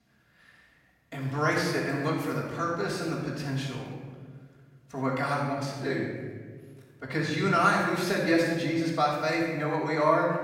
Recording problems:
room echo; strong; dies away in 1.4 s
off-mic speech; far

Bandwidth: 16.5 kHz